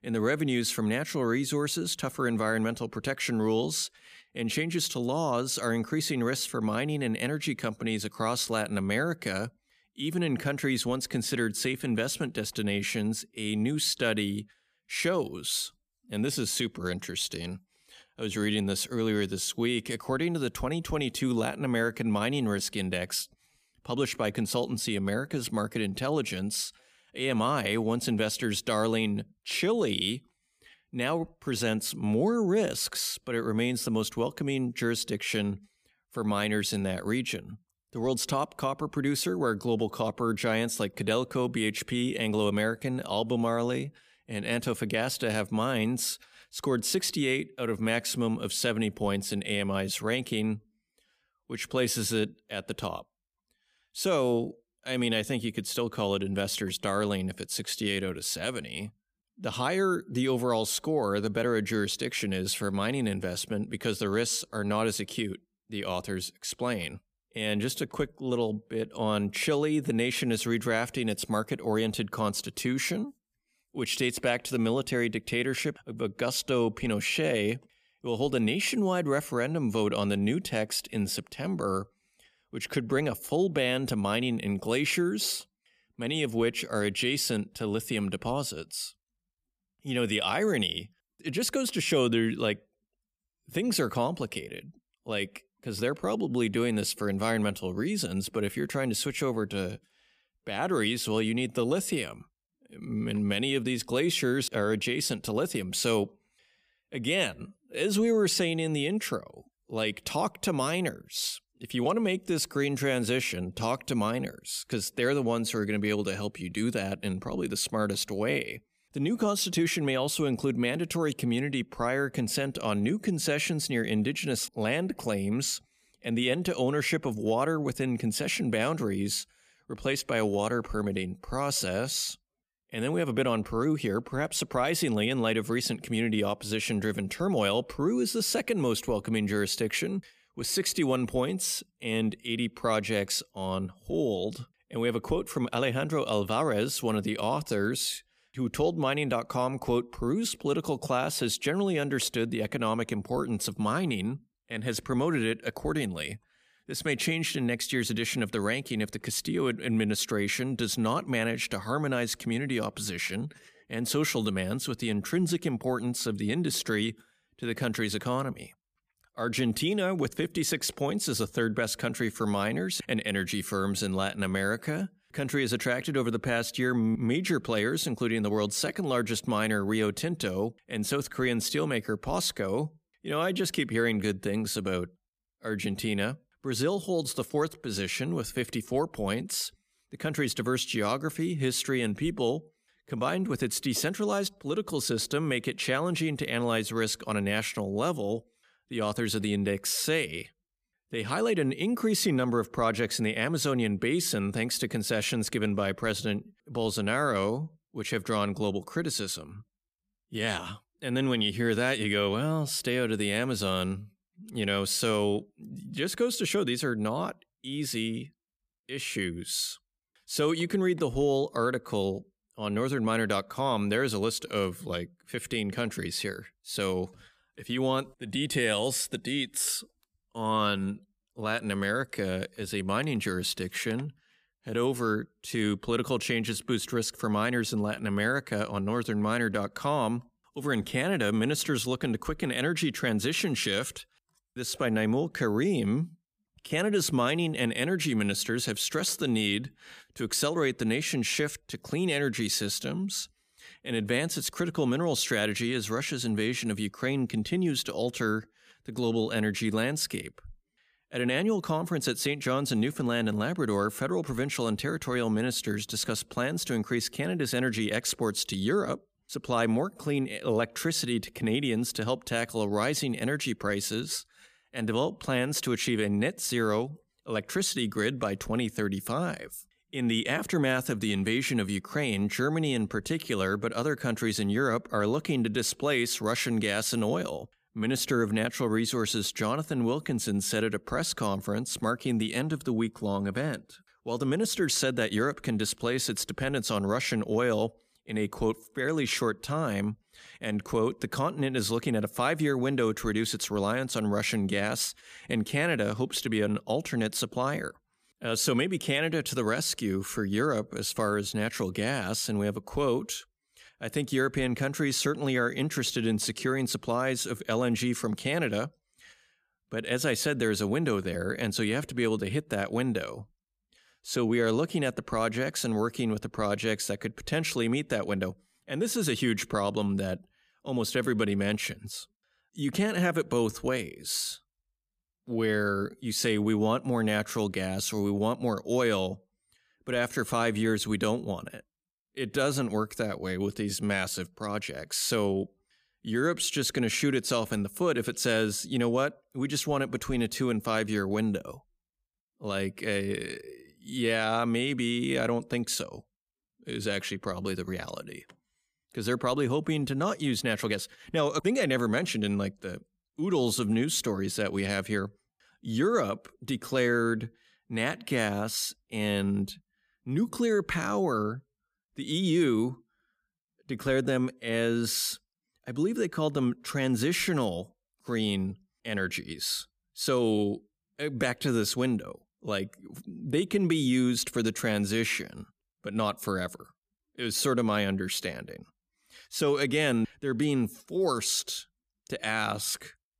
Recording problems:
none

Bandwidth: 15 kHz